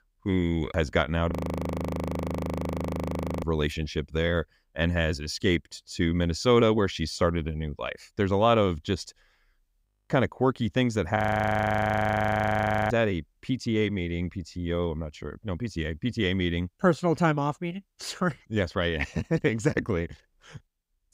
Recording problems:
audio freezing; at 1.5 s for 2 s, at 10 s and at 11 s for 1.5 s

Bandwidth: 15.5 kHz